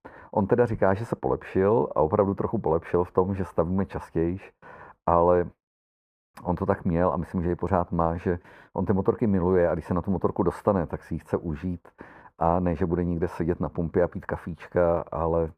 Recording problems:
muffled; very; fading above 2 kHz

